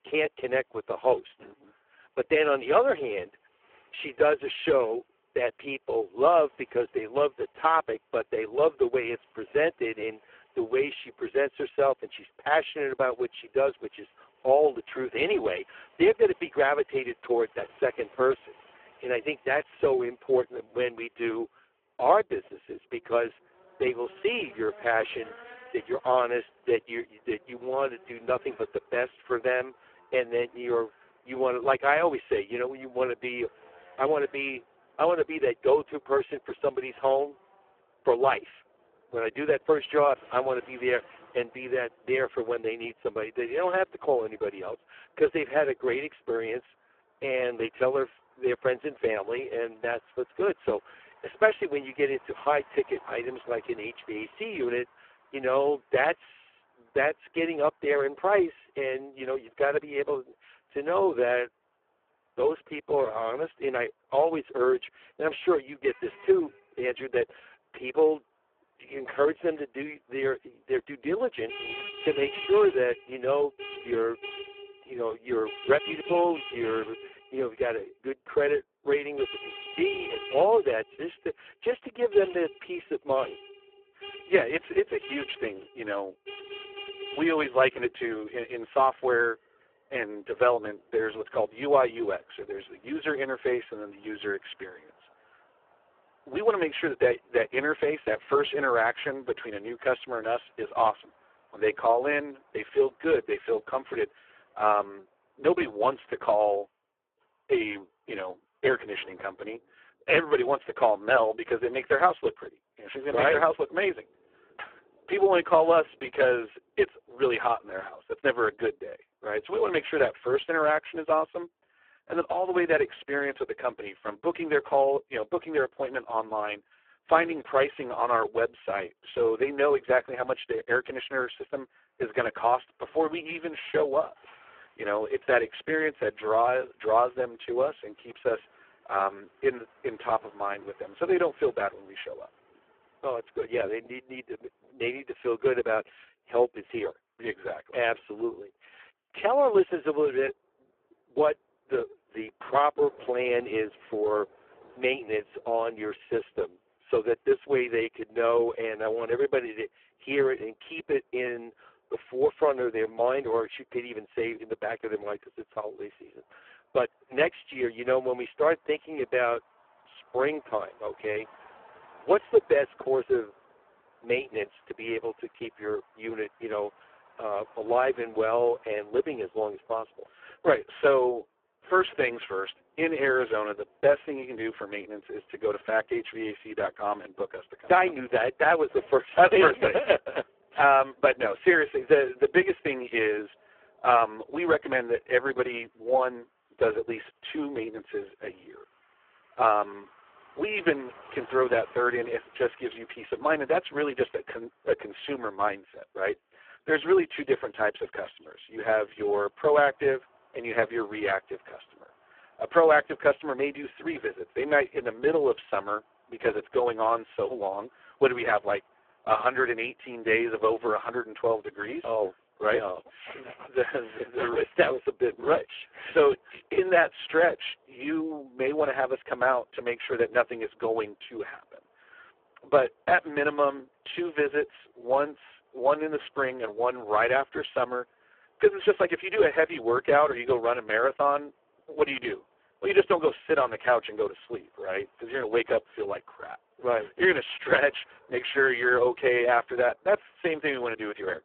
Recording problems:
phone-call audio; poor line
traffic noise; faint; throughout; 20 dB below the speech

